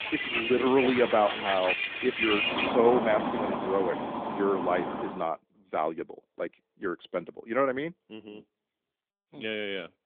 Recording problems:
phone-call audio
traffic noise; loud; until 5 s; 1 dB below the speech

